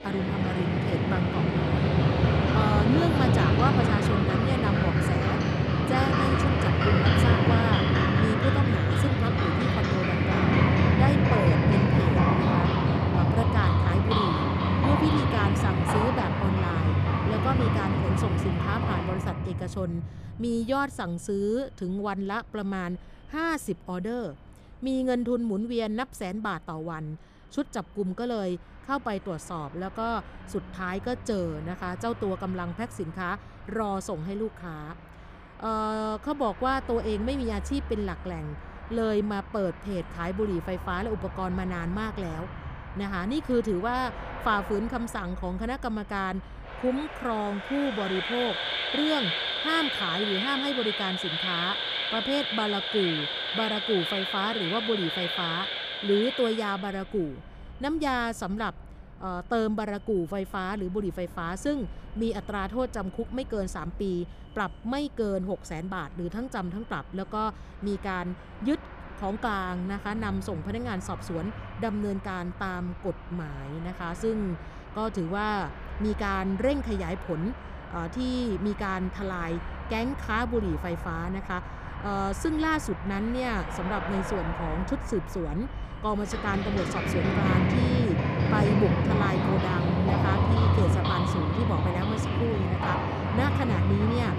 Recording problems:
animal sounds; very loud; throughout; 5 dB above the speech

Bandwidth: 15 kHz